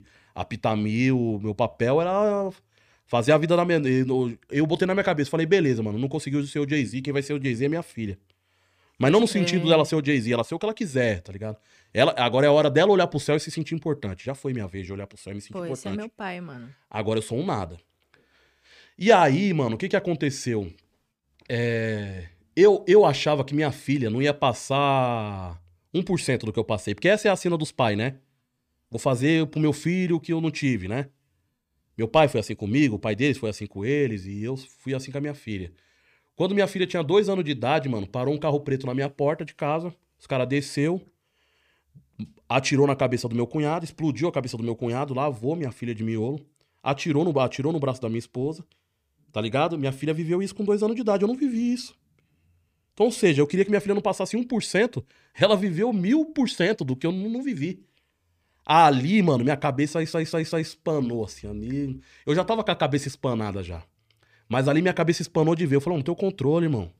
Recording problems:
audio stuttering; at 1:00

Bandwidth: 15 kHz